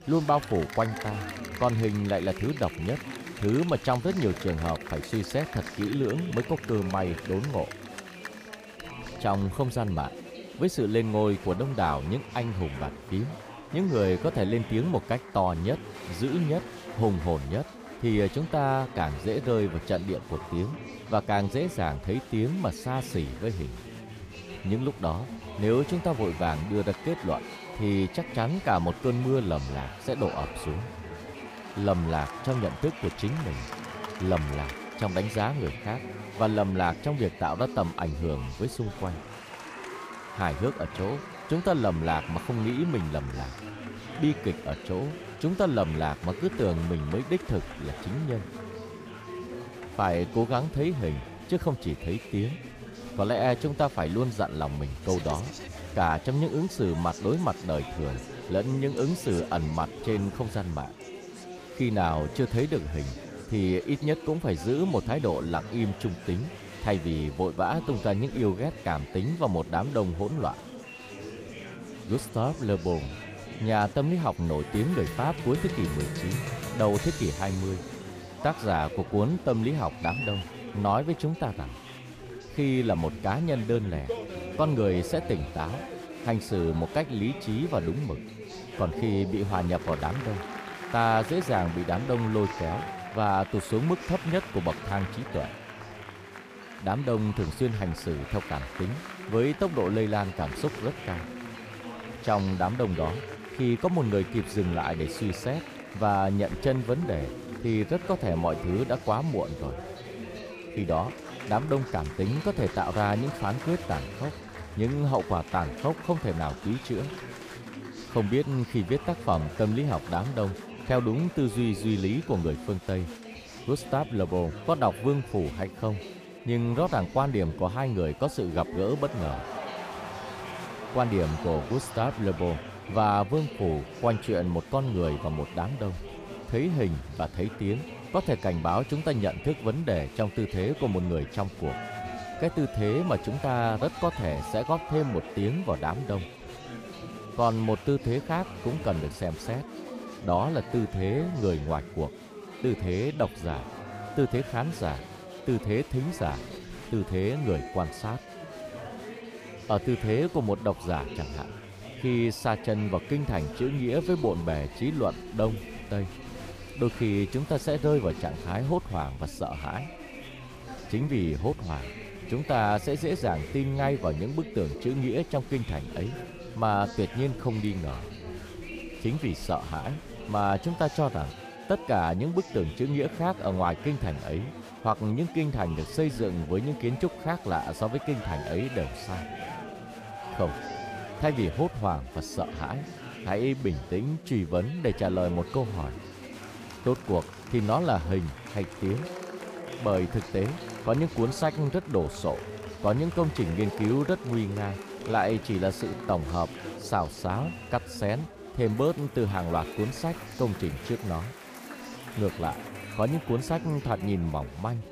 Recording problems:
chatter from many people; noticeable; throughout; 10 dB below the speech

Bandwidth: 15 kHz